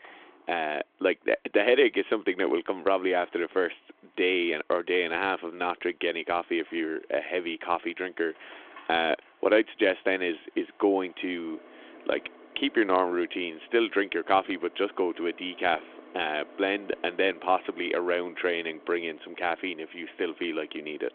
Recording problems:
phone-call audio; nothing above 3.5 kHz
traffic noise; faint; throughout; 25 dB below the speech

